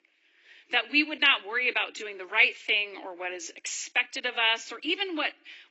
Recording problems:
garbled, watery; badly; nothing above 8 kHz
thin; somewhat; fading below 300 Hz

